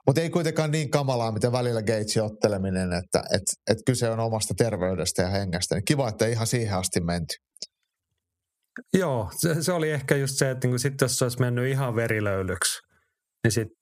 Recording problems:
squashed, flat; somewhat

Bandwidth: 14.5 kHz